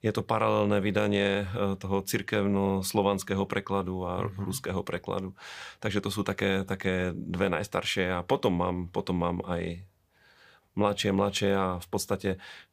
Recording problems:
none

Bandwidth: 15 kHz